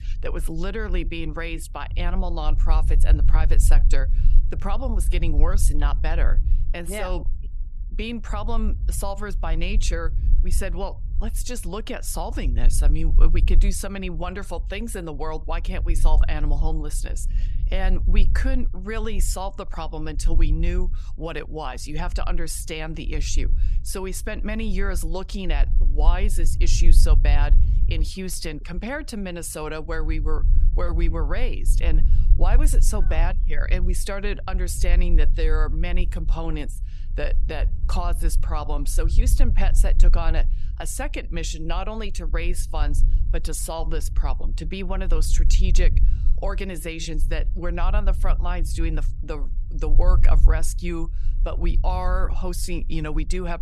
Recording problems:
low rumble; noticeable; throughout; 15 dB below the speech

